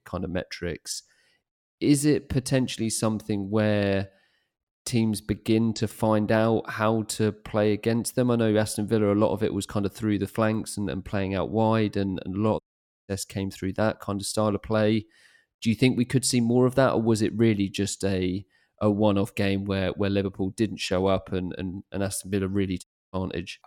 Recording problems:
audio cutting out; at 13 s and at 23 s

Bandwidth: 17.5 kHz